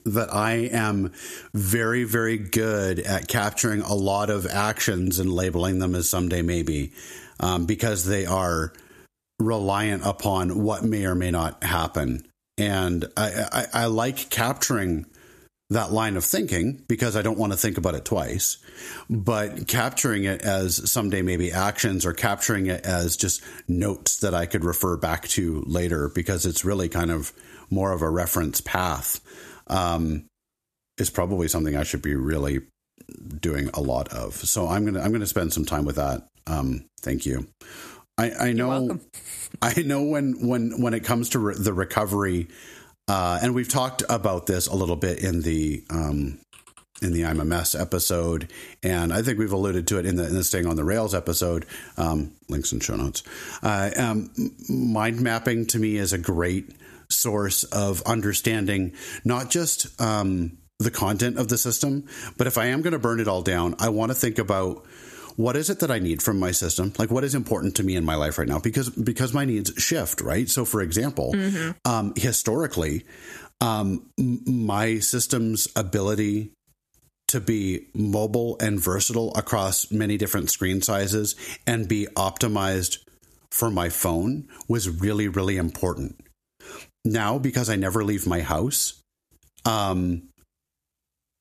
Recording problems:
squashed, flat; somewhat

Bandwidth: 14.5 kHz